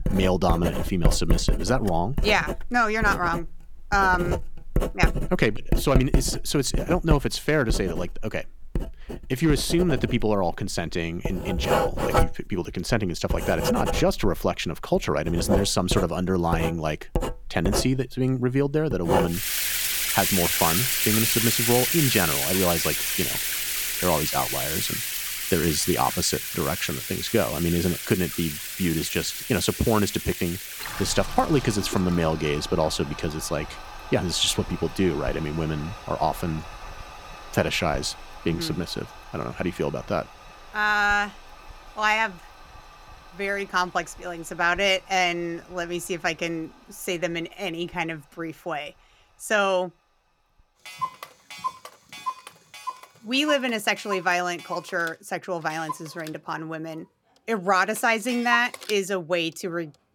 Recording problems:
household noises; loud; throughout; 3 dB below the speech

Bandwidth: 17.5 kHz